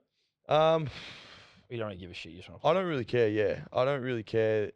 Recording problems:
muffled; slightly; fading above 2.5 kHz

